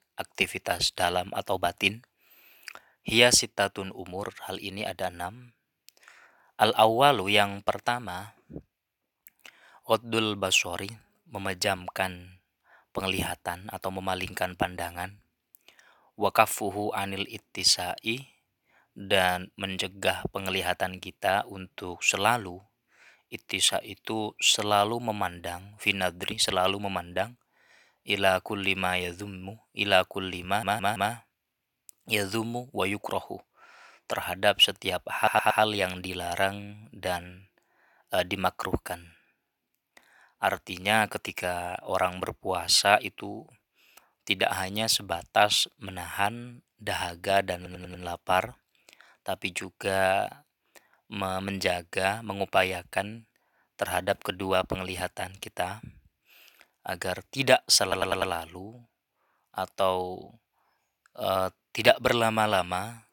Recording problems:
thin; somewhat; fading below 550 Hz
audio stuttering; 4 times, first at 30 s

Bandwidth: 17.5 kHz